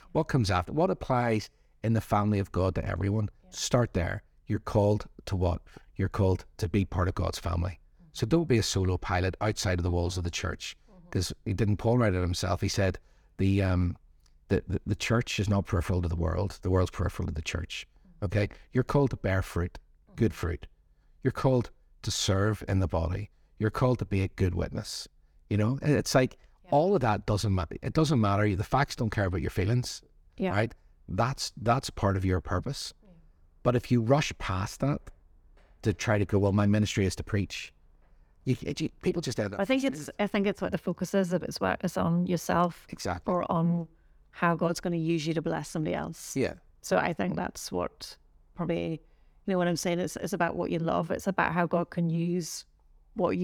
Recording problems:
abrupt cut into speech; at the end

